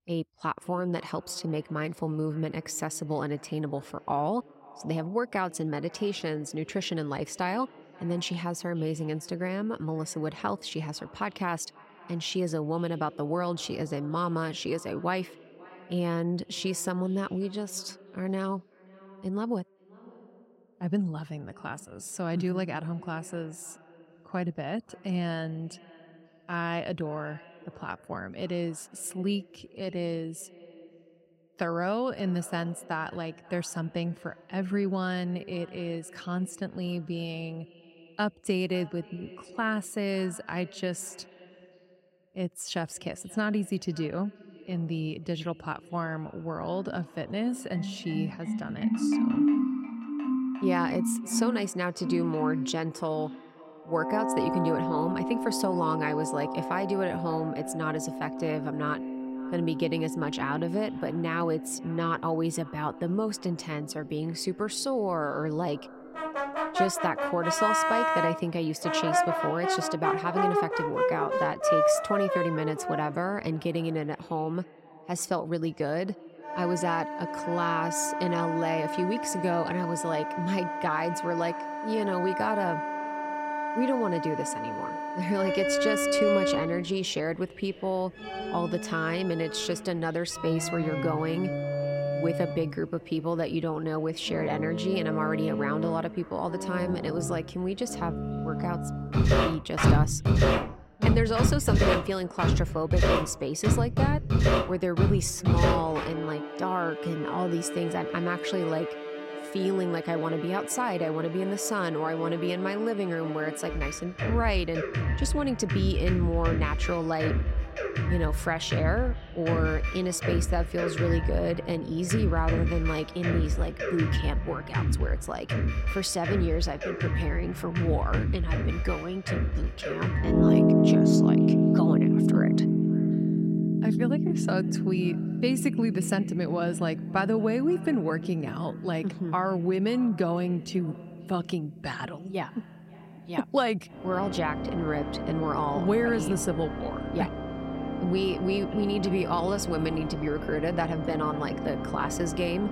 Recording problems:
echo of what is said; faint; throughout; 530 ms later, 20 dB below the speech
background music; very loud; from 47 s on; 1 dB above the speech

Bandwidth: 16 kHz